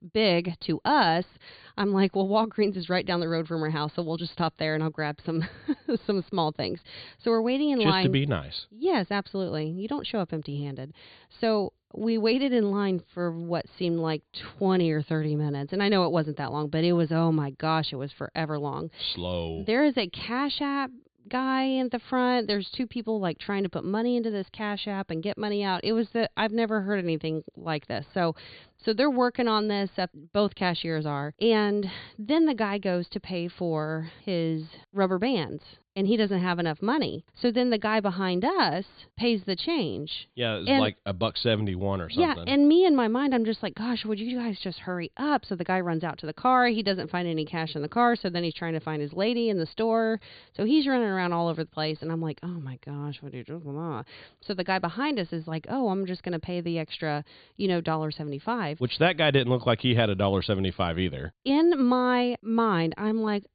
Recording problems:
high frequencies cut off; severe; nothing above 4.5 kHz

